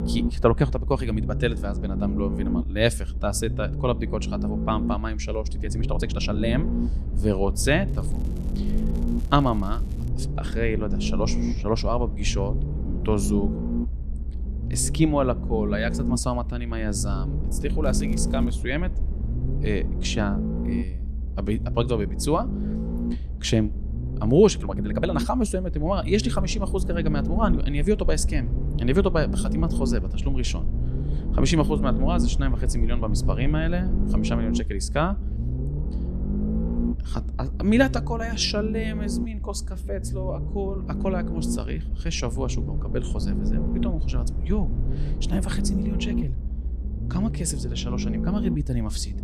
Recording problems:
low rumble; loud; throughout; 9 dB below the speech
crackling; faint; from 8 to 10 s and at 18 s; 30 dB below the speech
uneven, jittery; strongly; from 5.5 to 30 s

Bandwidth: 13.5 kHz